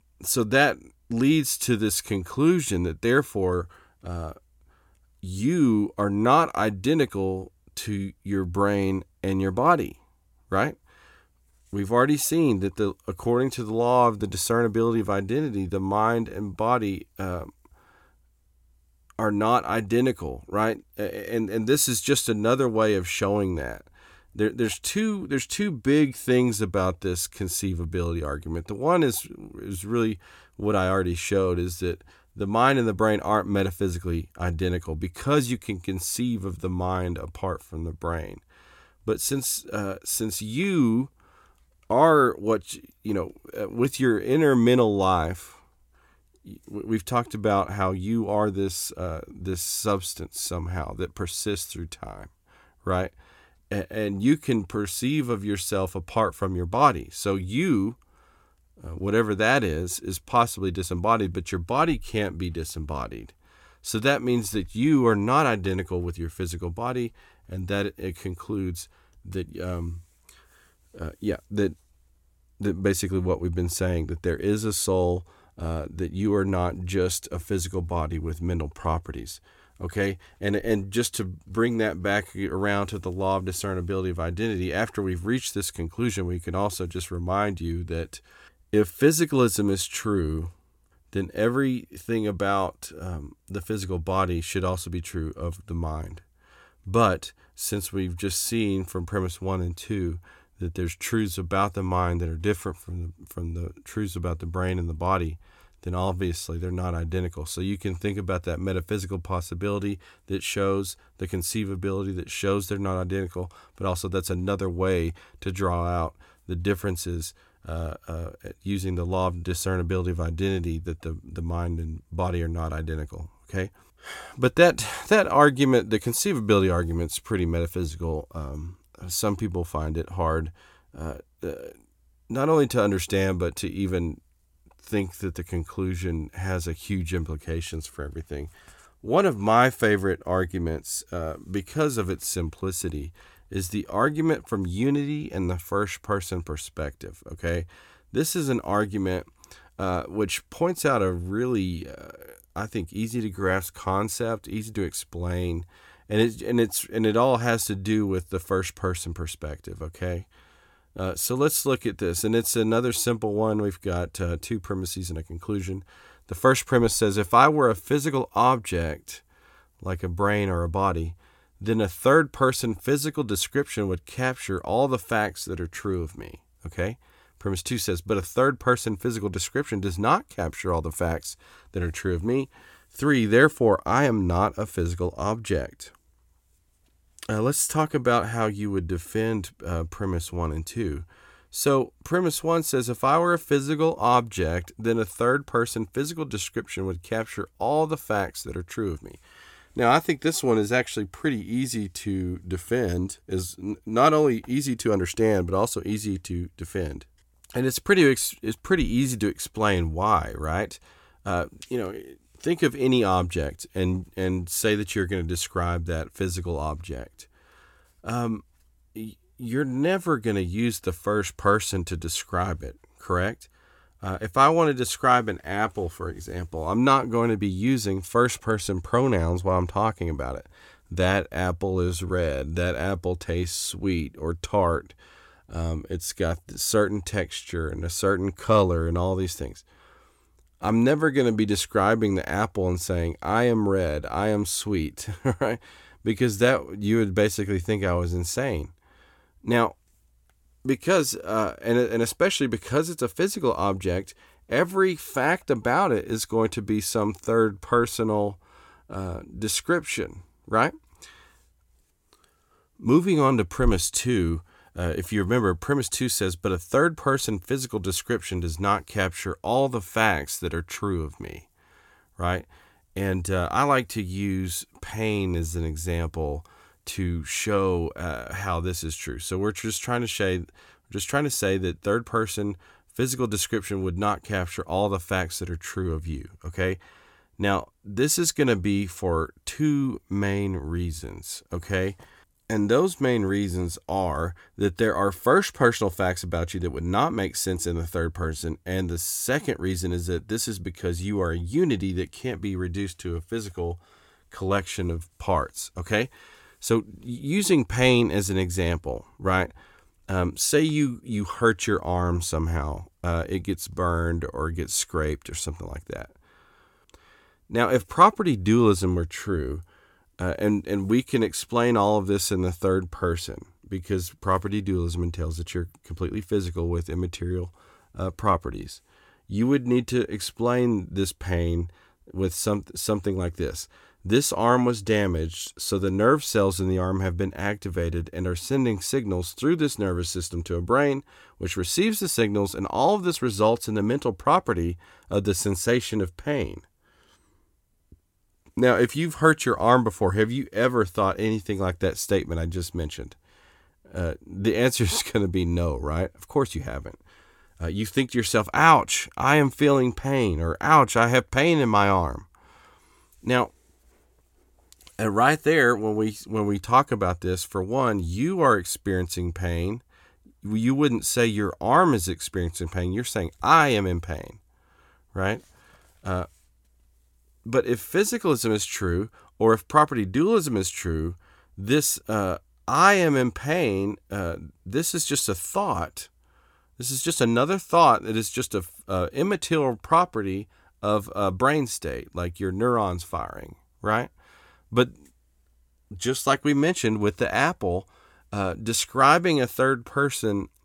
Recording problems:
none

